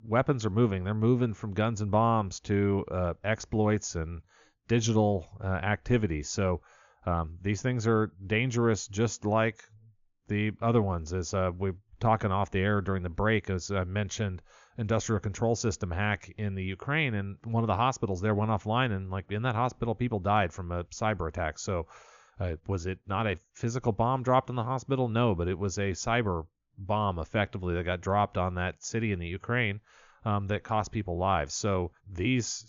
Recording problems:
high frequencies cut off; noticeable; nothing above 7 kHz

